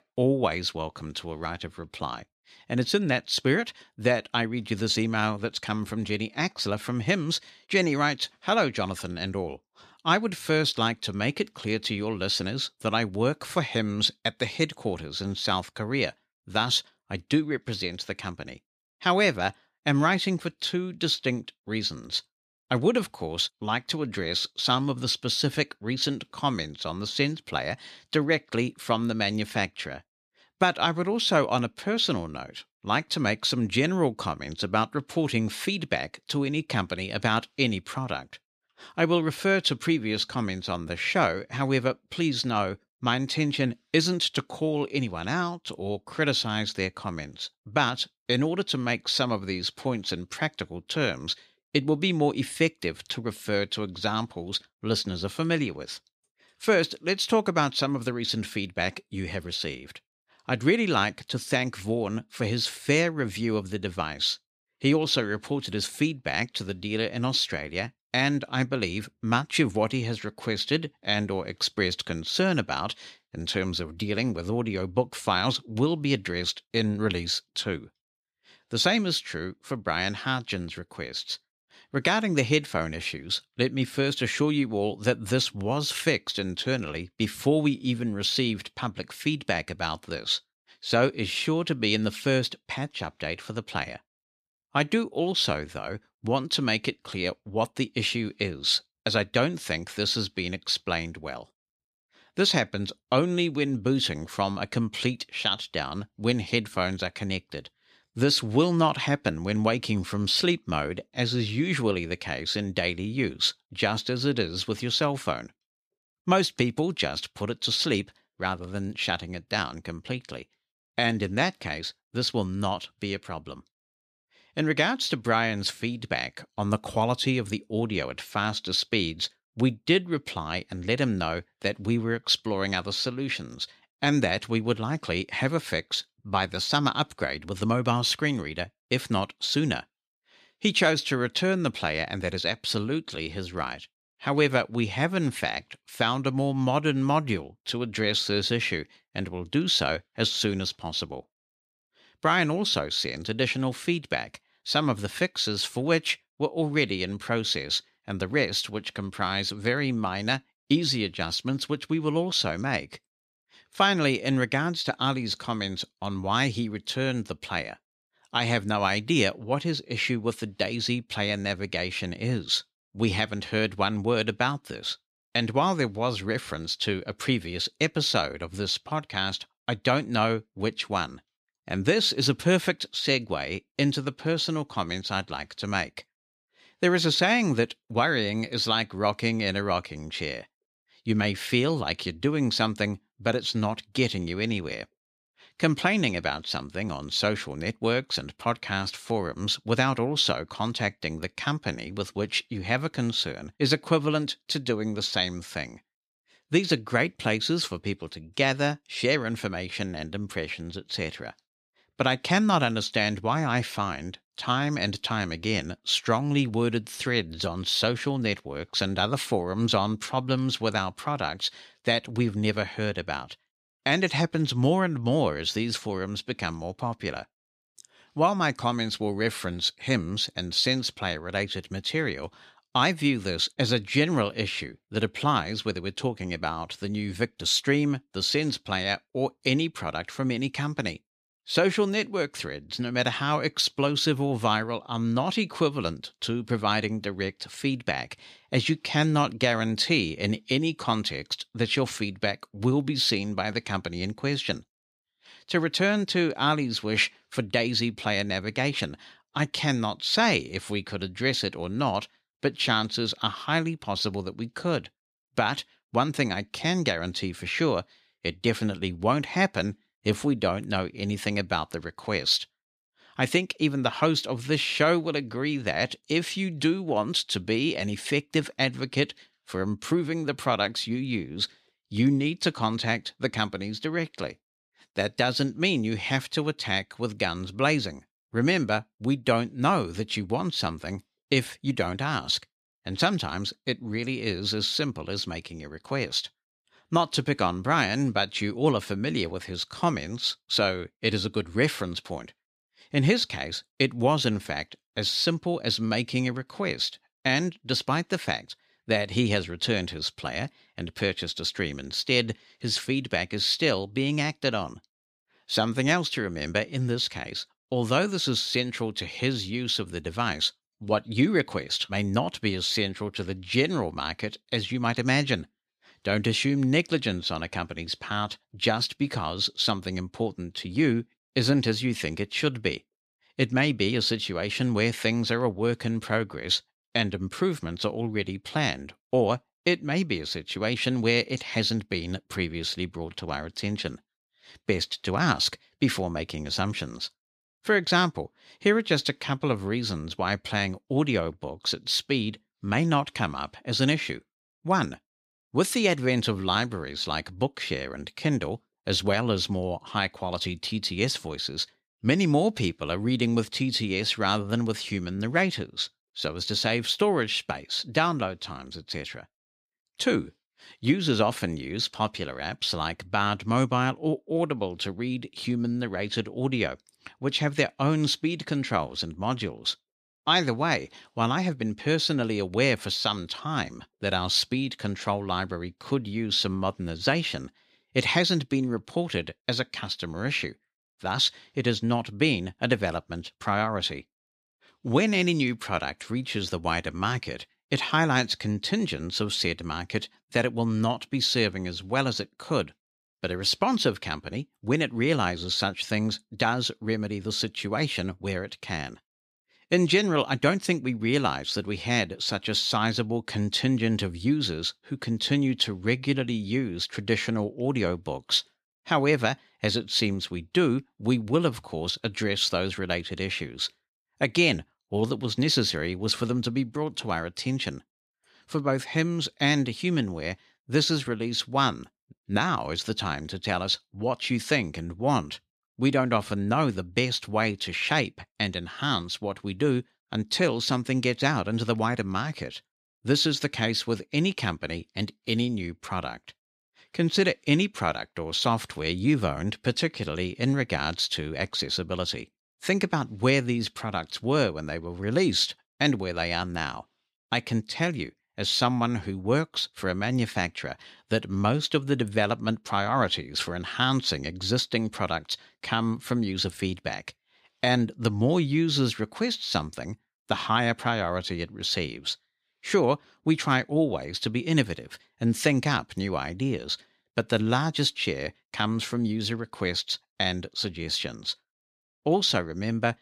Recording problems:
none

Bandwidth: 14.5 kHz